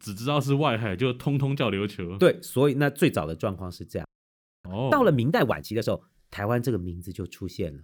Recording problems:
audio freezing; at 4 s for 0.5 s

